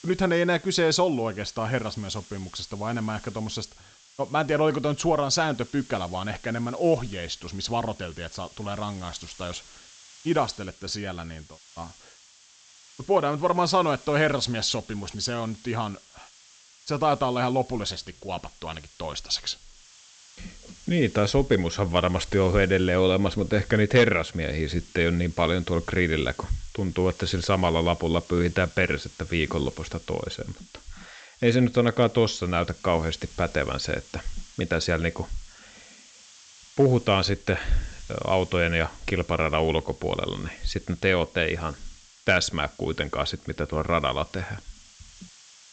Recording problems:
high frequencies cut off; noticeable; nothing above 8 kHz
hiss; faint; throughout; 25 dB below the speech

